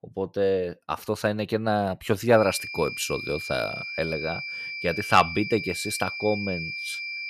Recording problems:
high-pitched whine; loud; from 2.5 s on; 2.5 kHz, 6 dB below the speech

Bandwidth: 14 kHz